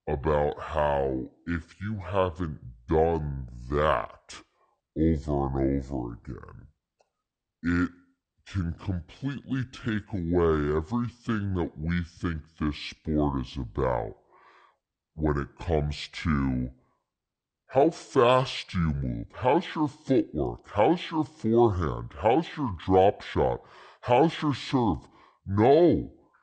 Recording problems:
wrong speed and pitch; too slow and too low; 0.6 times normal speed

